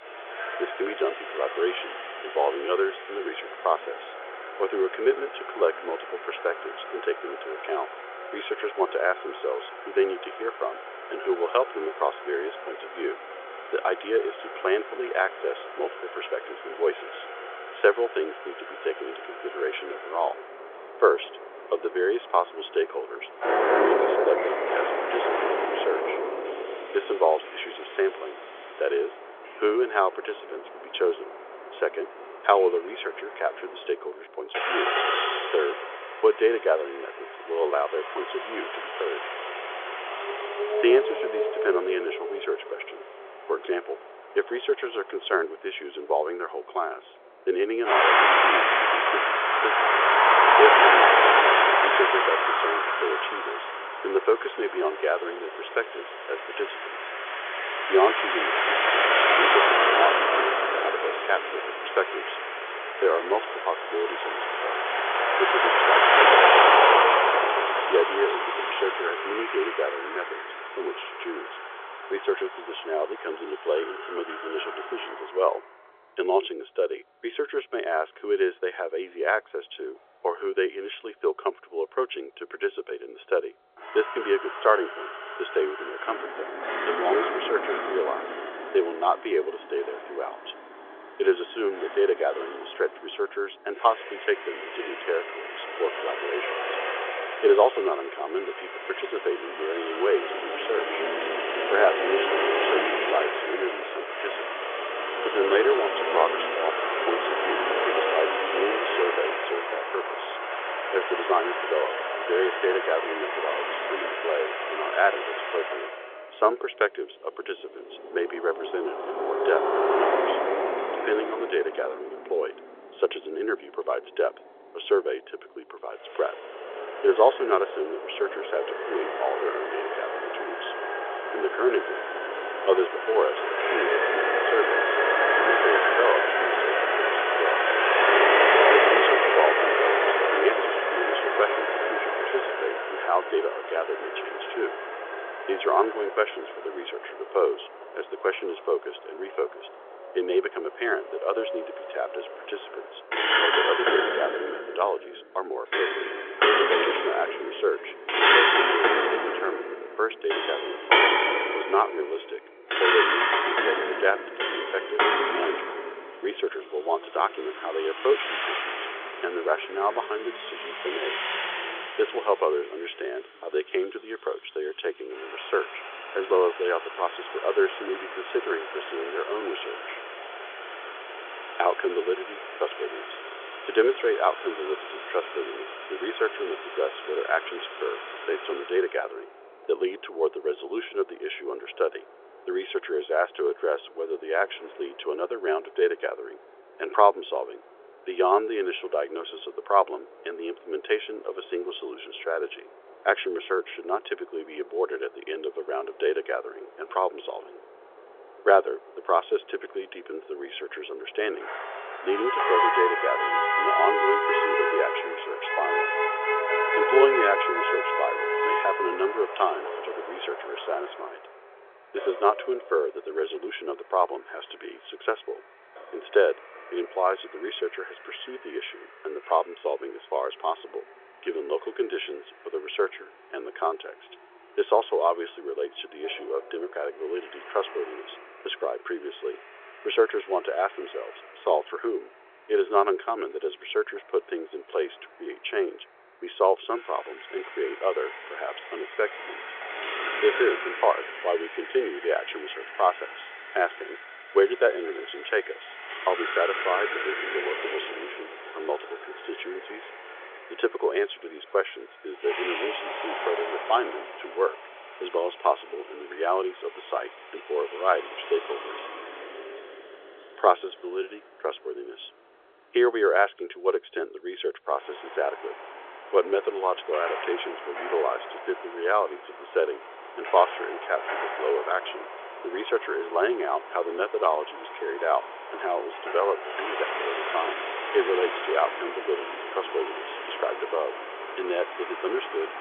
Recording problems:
phone-call audio; nothing above 3.5 kHz
traffic noise; very loud; throughout; 3 dB above the speech

